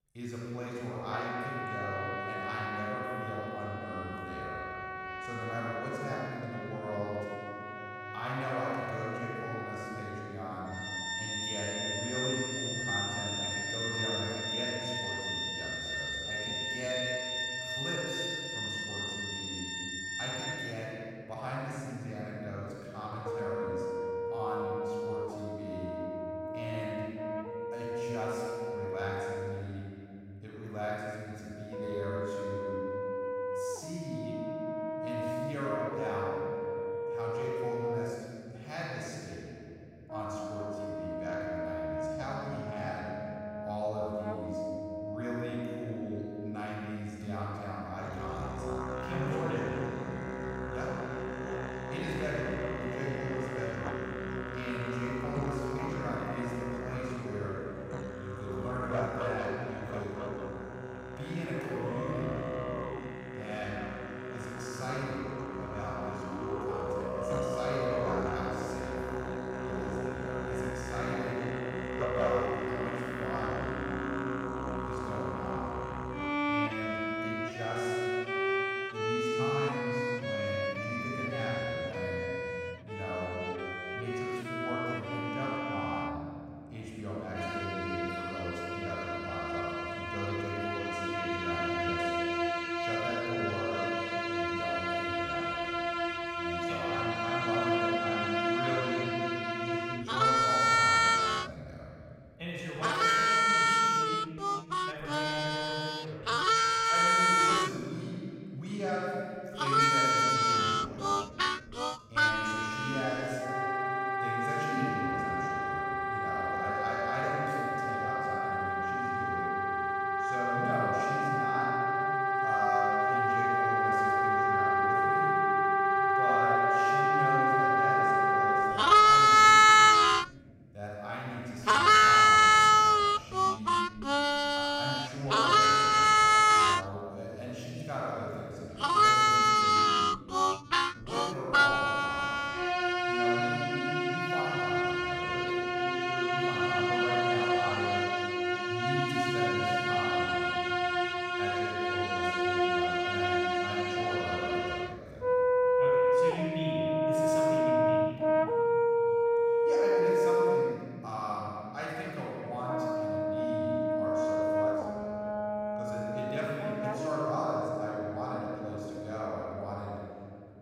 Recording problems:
room echo; strong; dies away in 3 s
off-mic speech; far
background music; very loud; throughout; 10 dB above the speech

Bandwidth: 16.5 kHz